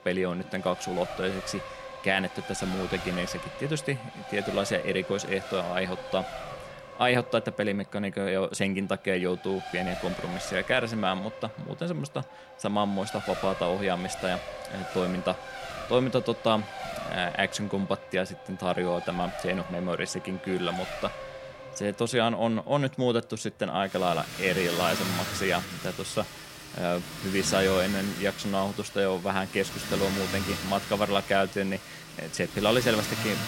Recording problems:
traffic noise; loud; throughout; 8 dB below the speech

